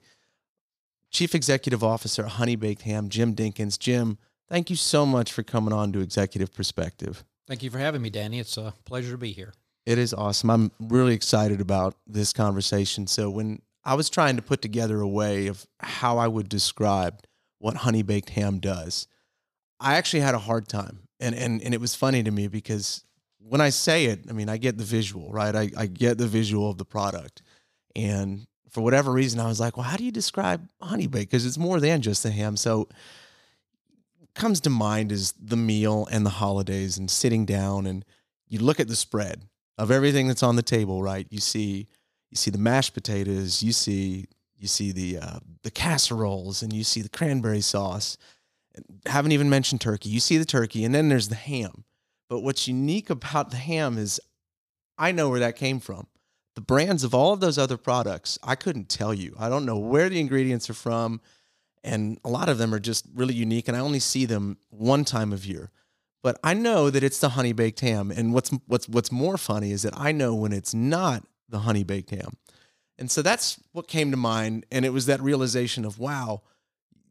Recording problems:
none

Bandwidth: 15 kHz